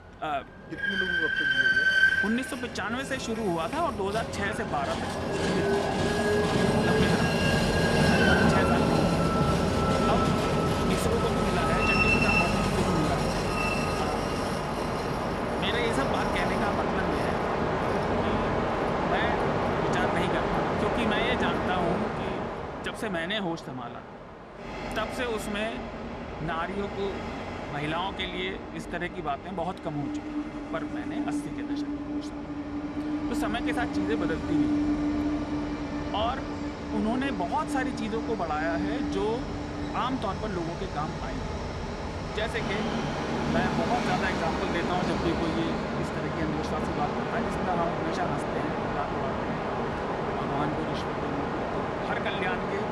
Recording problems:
train or aircraft noise; very loud; throughout; 5 dB above the speech

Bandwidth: 14.5 kHz